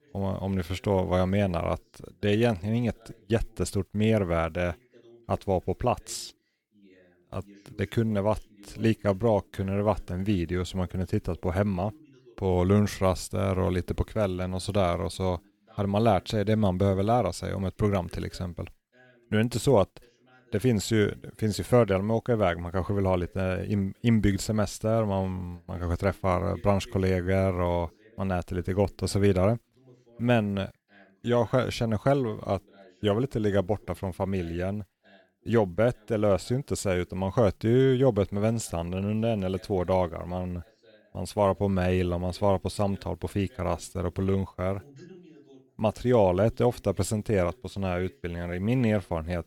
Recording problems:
voice in the background; faint; throughout; 30 dB below the speech

